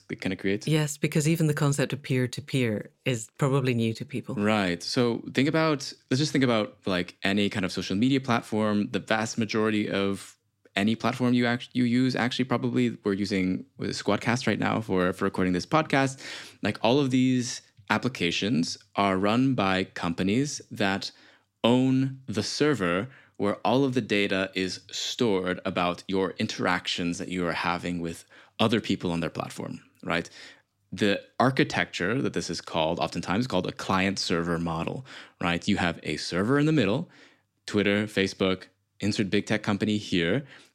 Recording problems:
none

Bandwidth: 16 kHz